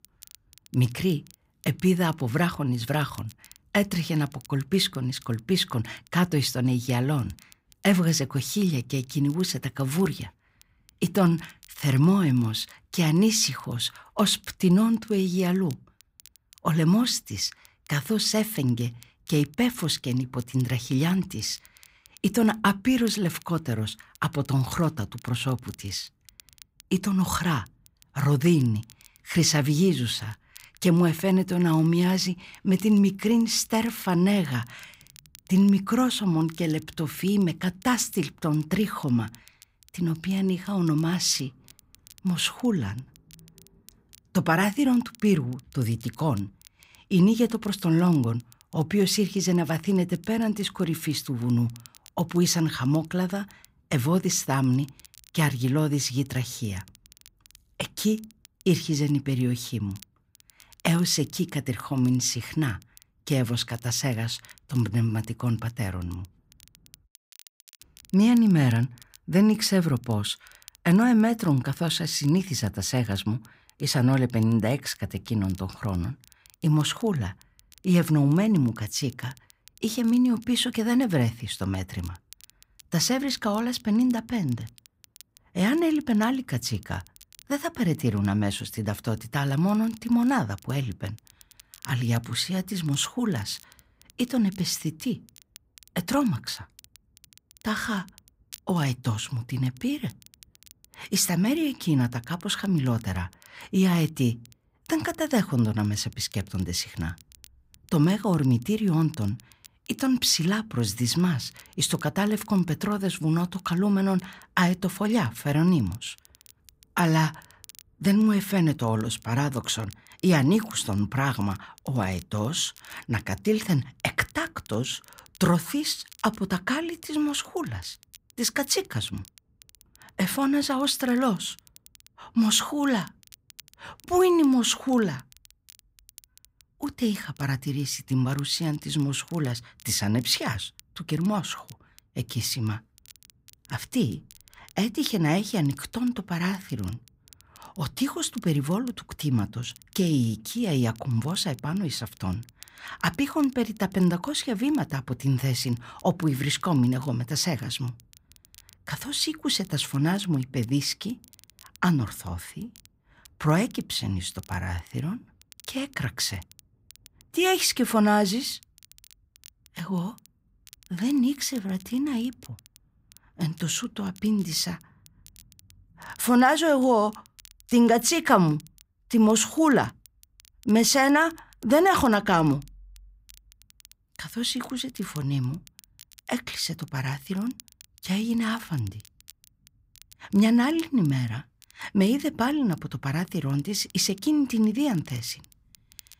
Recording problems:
crackle, like an old record; faint; 25 dB below the speech

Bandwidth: 15.5 kHz